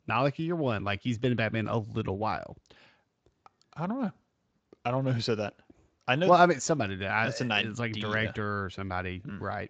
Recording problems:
garbled, watery; slightly; nothing above 7.5 kHz

